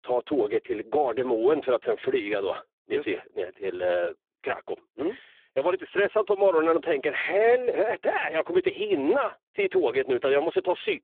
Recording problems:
phone-call audio; poor line

